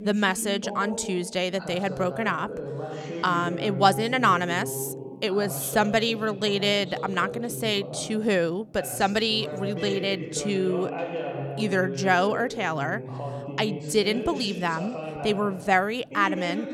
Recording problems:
voice in the background; loud; throughout; 9 dB below the speech

